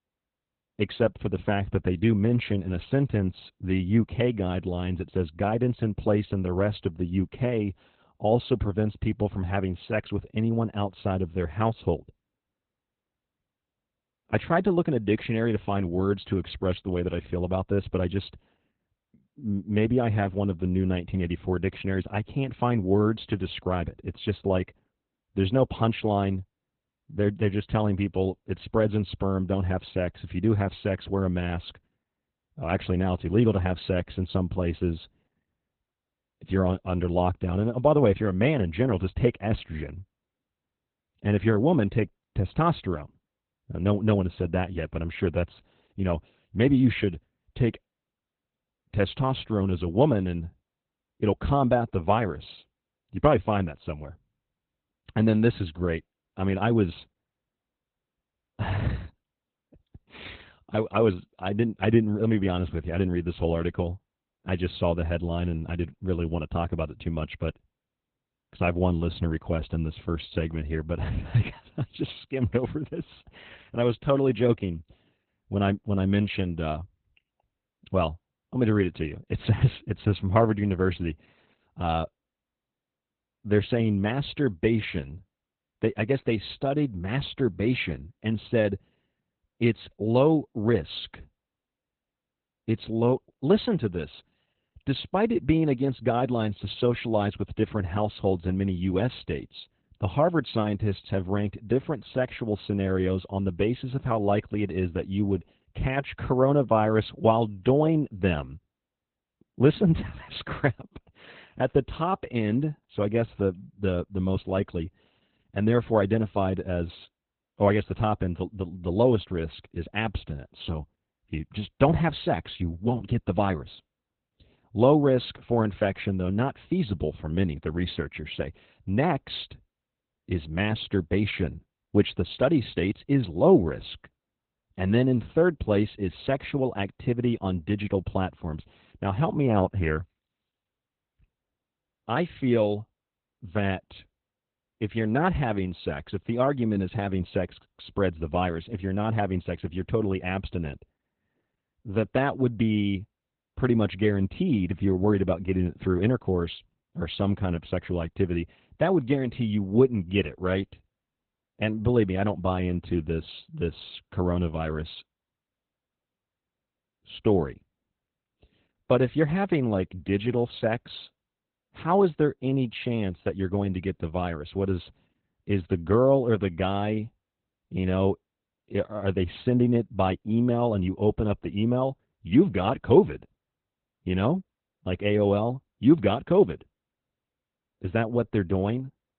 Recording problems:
garbled, watery; badly; nothing above 4 kHz

